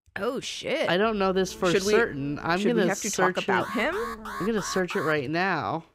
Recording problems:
electrical hum; faint; from 1 to 2.5 s and from 4 to 5 s; 60 Hz, 25 dB below the speech
alarm; noticeable; from 3.5 to 5 s; peak 10 dB below the speech

